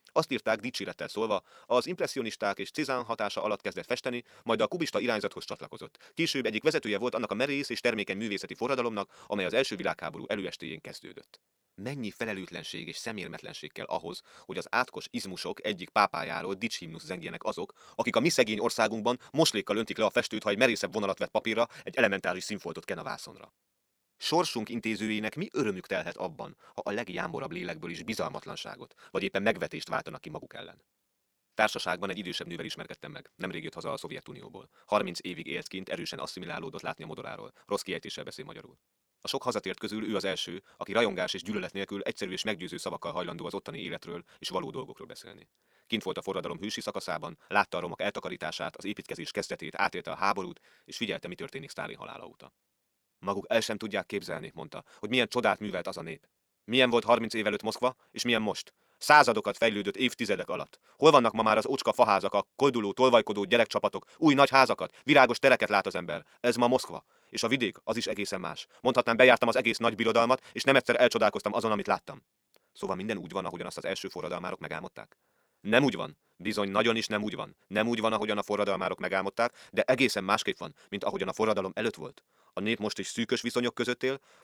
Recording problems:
wrong speed, natural pitch; too fast; 1.5 times normal speed

